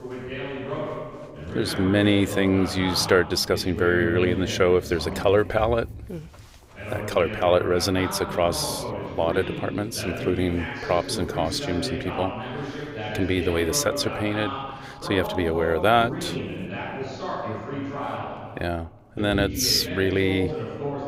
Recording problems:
voice in the background; loud; throughout; 8 dB below the speech

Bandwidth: 15.5 kHz